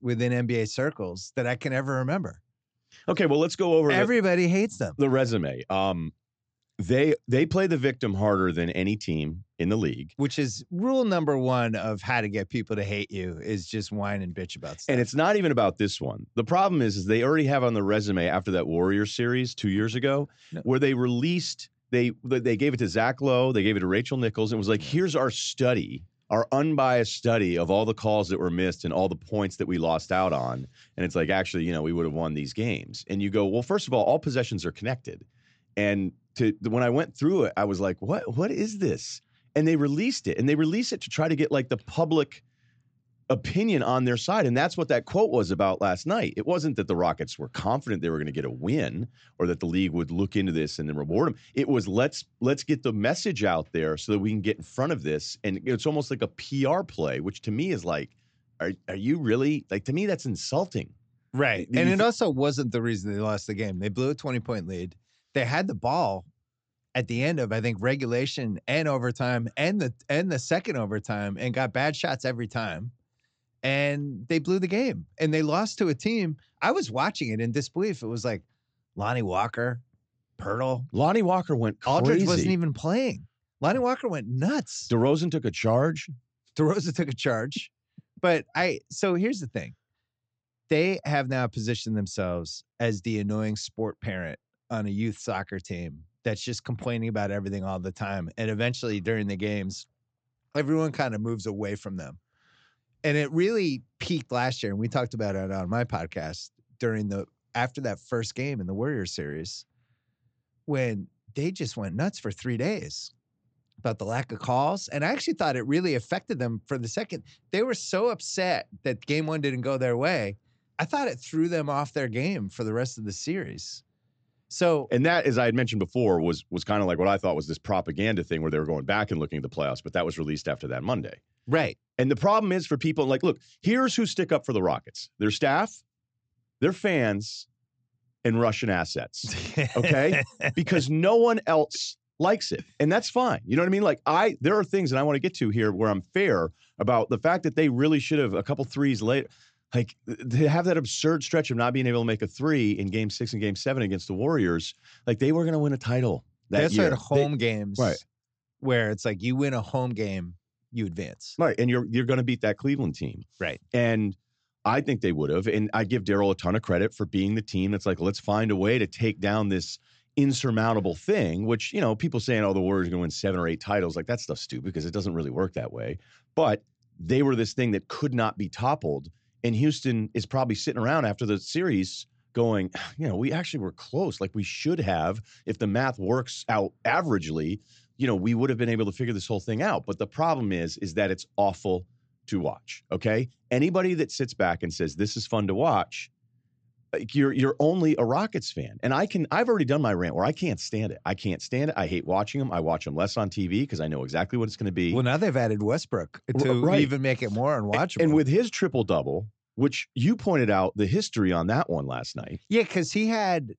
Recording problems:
high frequencies cut off; noticeable; nothing above 8 kHz

